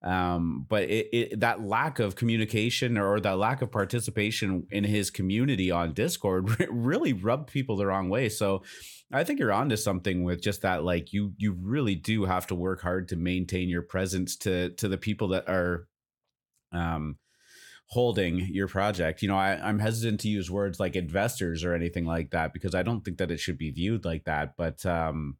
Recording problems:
none

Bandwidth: 17.5 kHz